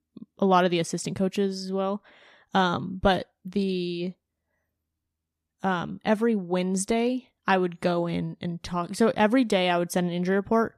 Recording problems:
none

